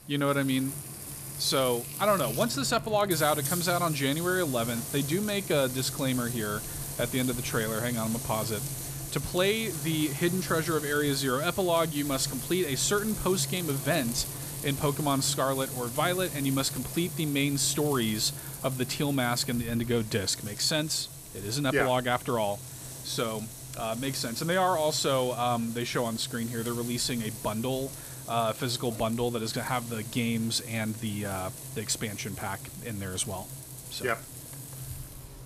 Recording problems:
household noises; loud; throughout; 7 dB below the speech

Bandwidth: 14.5 kHz